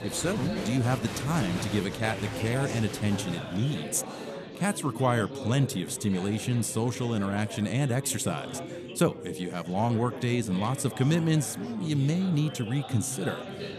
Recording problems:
chatter from many people; loud; throughout; 9 dB below the speech

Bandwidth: 13.5 kHz